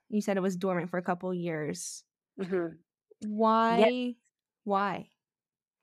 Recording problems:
none

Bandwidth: 14 kHz